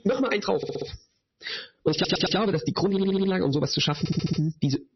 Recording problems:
wrong speed, natural pitch; too fast; 1.5 times normal speed
distortion; slight; 10 dB below the speech
garbled, watery; slightly; nothing above 6 kHz
squashed, flat; somewhat
audio stuttering; 4 times, first at 0.5 s

